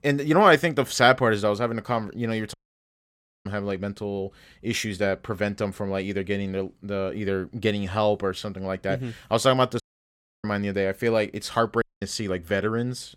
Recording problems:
audio cutting out; at 2.5 s for 1 s, at 10 s for 0.5 s and at 12 s

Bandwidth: 16.5 kHz